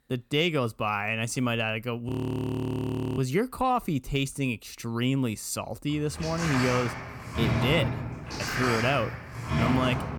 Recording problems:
audio freezing; at 2 s for 1 s
door banging; loud; from 6 s on; peak 2 dB above the speech

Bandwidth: 18 kHz